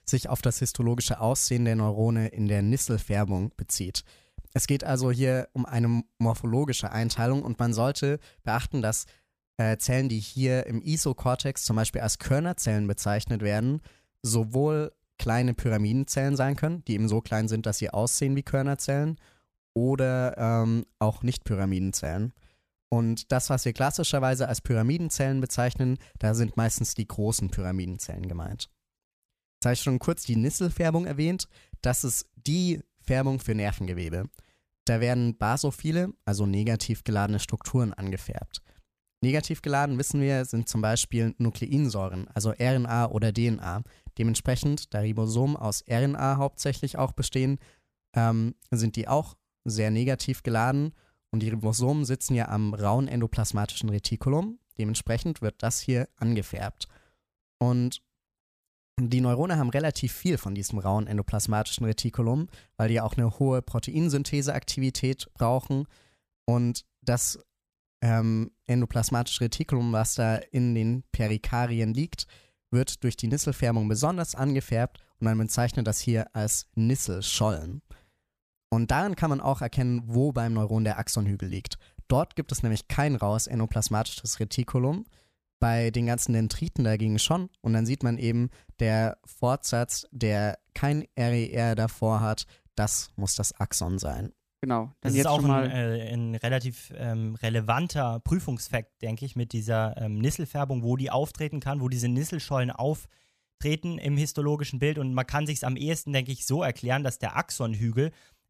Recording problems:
none

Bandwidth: 14.5 kHz